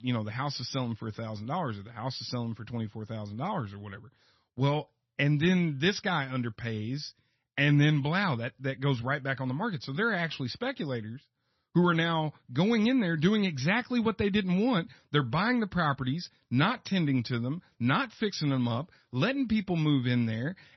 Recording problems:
garbled, watery; slightly; nothing above 6 kHz

